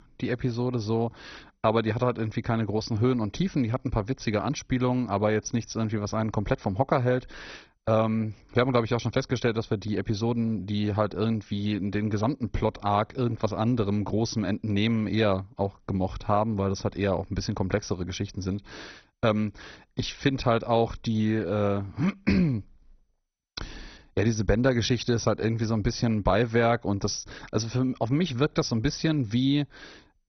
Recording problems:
garbled, watery; badly; nothing above 6 kHz

